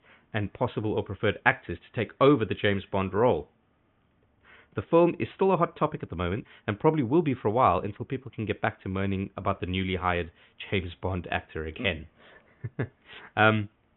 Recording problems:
high frequencies cut off; severe; nothing above 3.5 kHz

